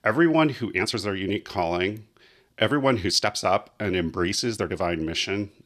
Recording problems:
uneven, jittery; strongly; from 0.5 to 5 s

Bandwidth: 14.5 kHz